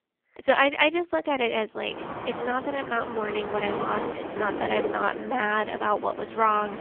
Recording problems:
phone-call audio; poor line; nothing above 3.5 kHz
wind in the background; loud; from 2 s on; 8 dB below the speech

